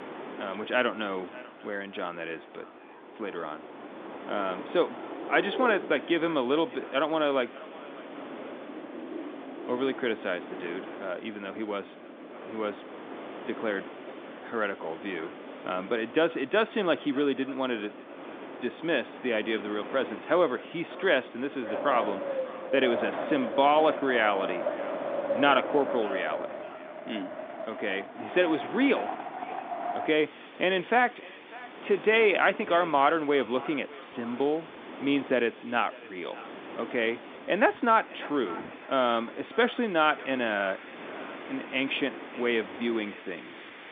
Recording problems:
echo of what is said; faint; throughout; 600 ms later, 20 dB below the speech
phone-call audio; nothing above 3.5 kHz
wind in the background; noticeable; throughout; 10 dB below the speech

